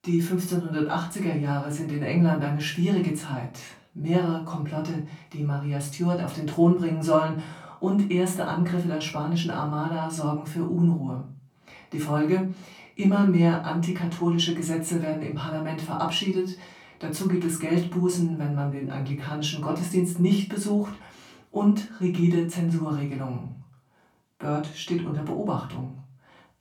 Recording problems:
off-mic speech; far
room echo; slight; dies away in 0.3 s

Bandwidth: 18.5 kHz